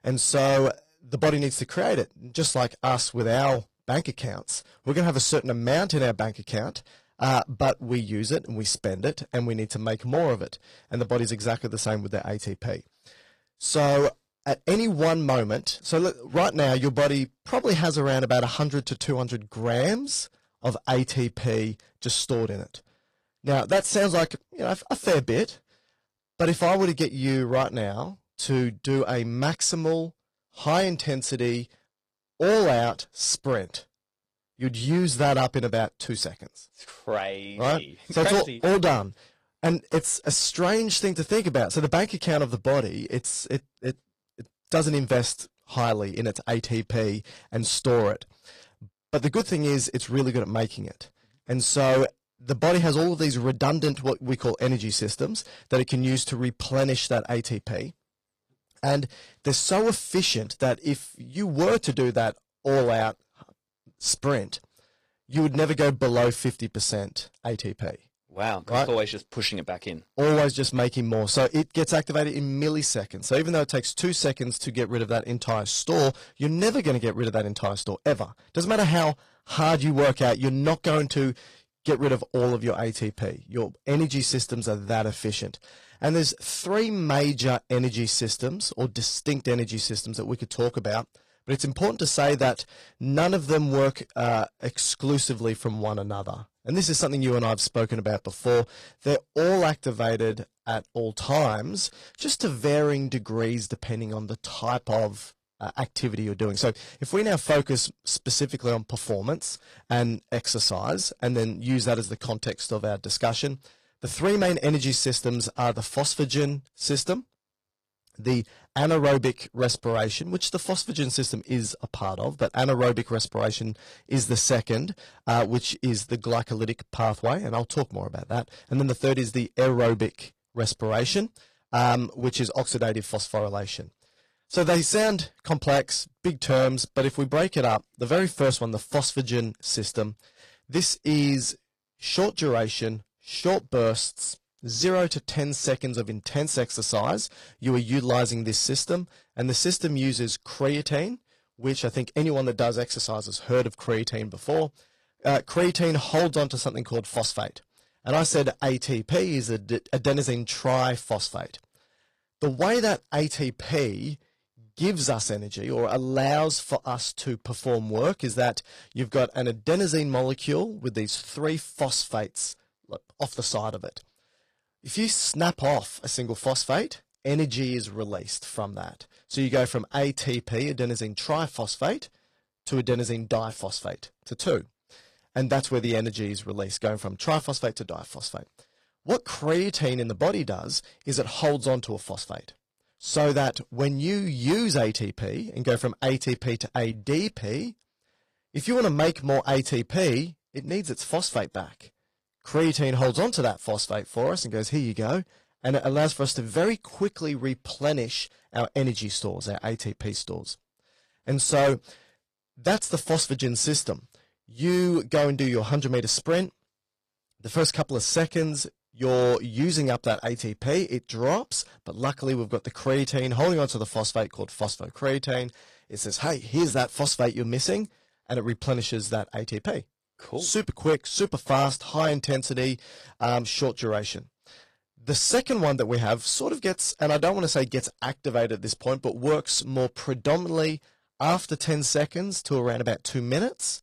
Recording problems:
distortion; slight; 4% of the sound clipped
garbled, watery; slightly; nothing above 15 kHz

